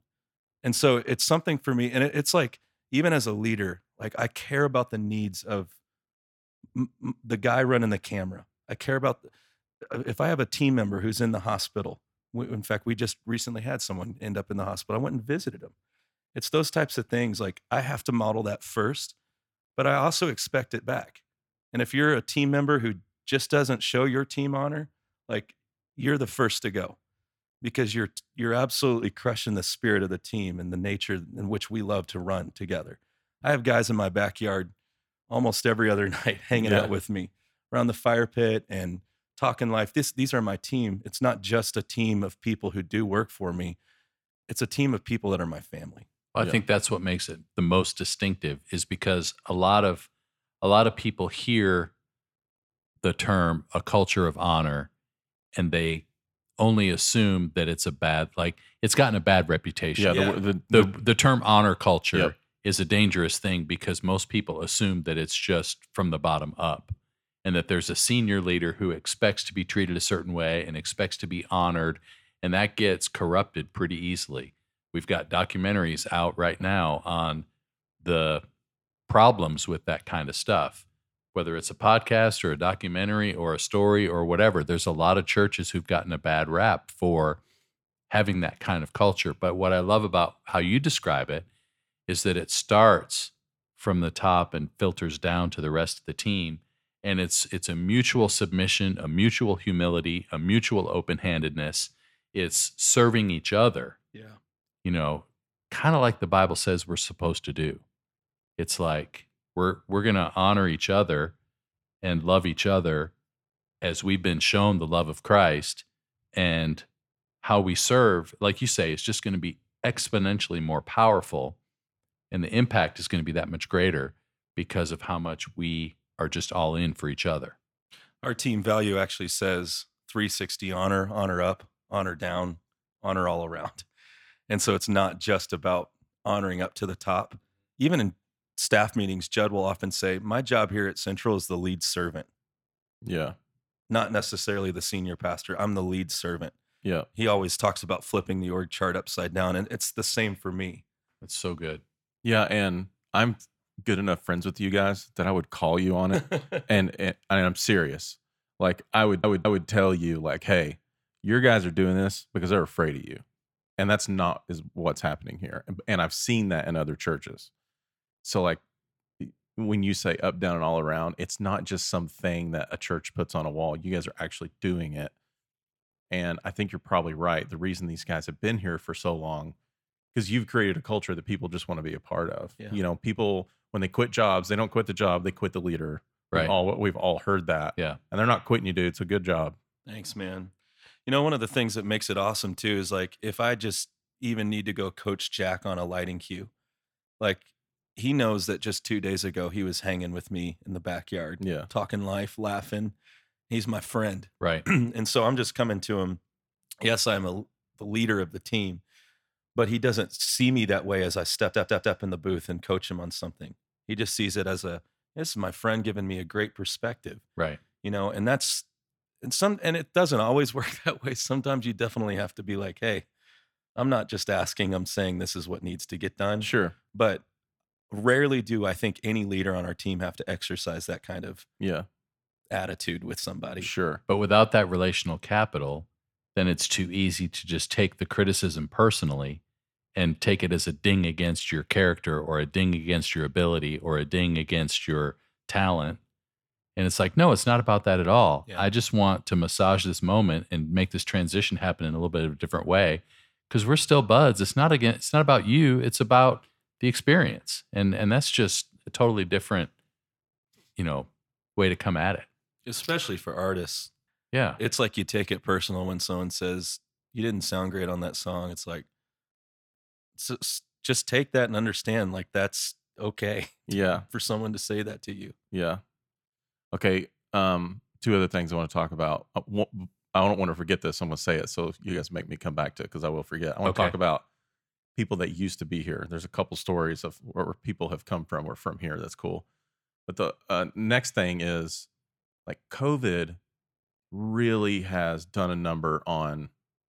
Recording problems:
audio stuttering; at 2:39 and at 3:31

